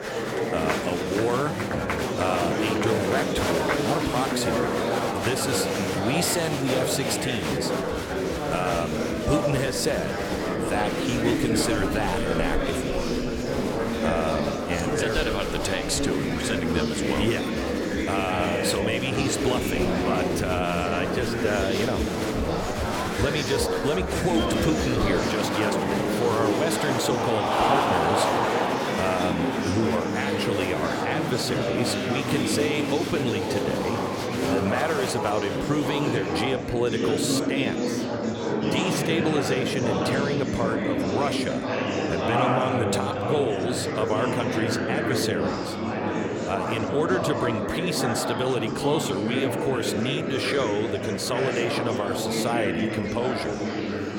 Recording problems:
murmuring crowd; very loud; throughout; 2 dB above the speech

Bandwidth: 17 kHz